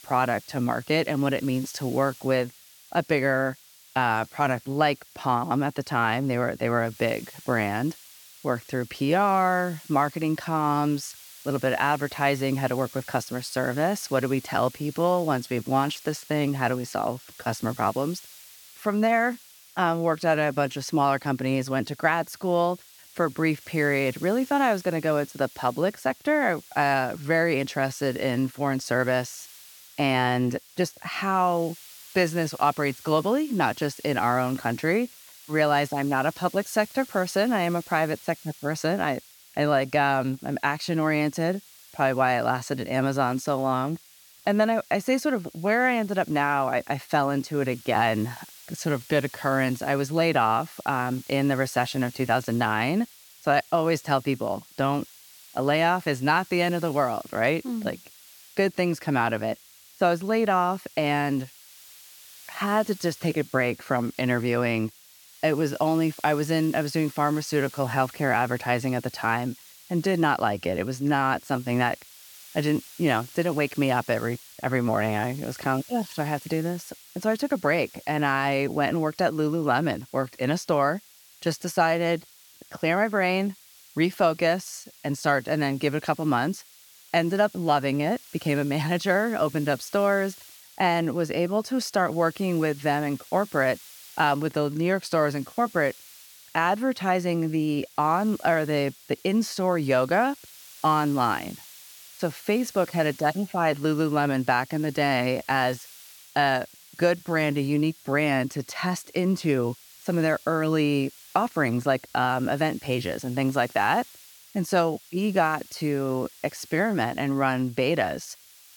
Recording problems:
hiss; faint; throughout; 20 dB below the speech

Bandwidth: 18 kHz